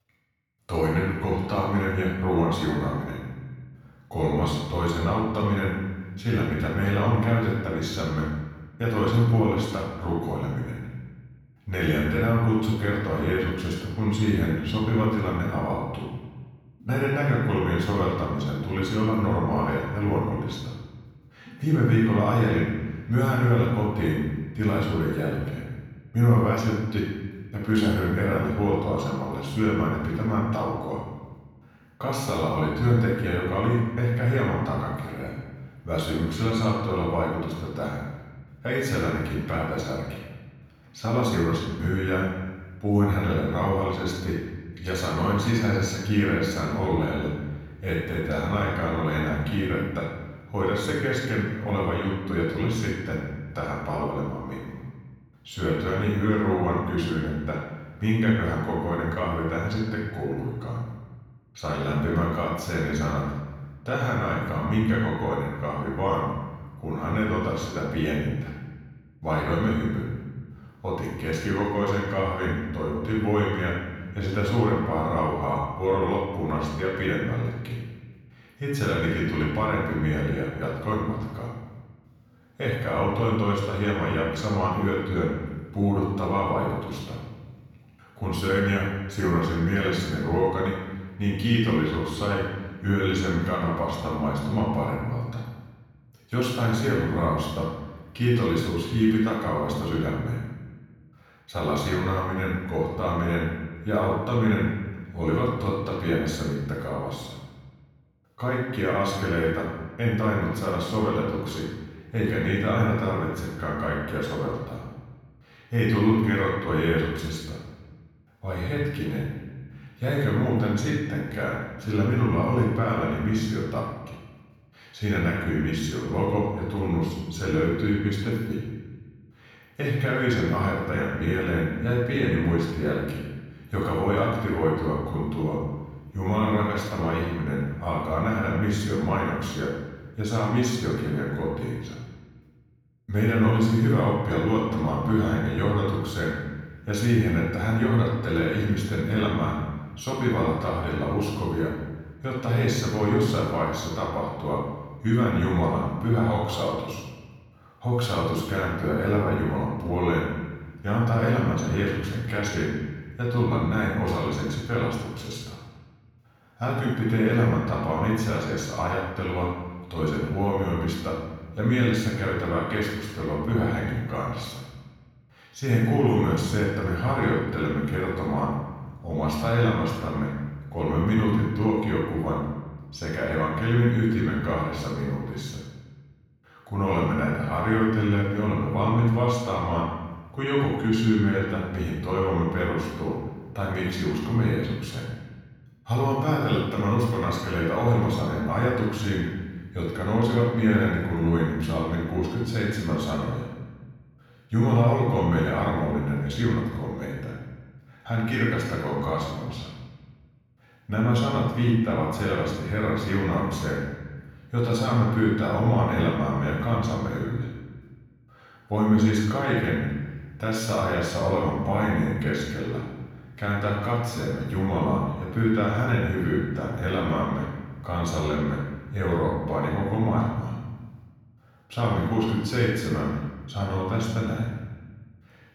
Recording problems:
room echo; strong; dies away in 1.2 s
off-mic speech; far
echo of what is said; faint; throughout; 110 ms later, 25 dB below the speech

